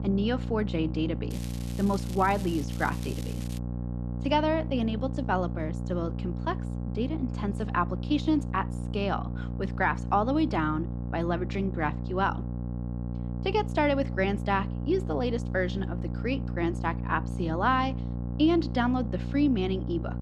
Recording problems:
electrical hum; noticeable; throughout; 60 Hz, 15 dB below the speech
crackling; noticeable; from 1.5 to 3.5 s; 15 dB below the speech

